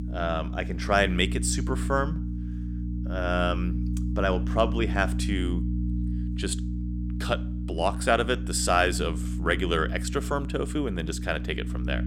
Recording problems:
electrical hum; noticeable; throughout; 60 Hz, 15 dB below the speech

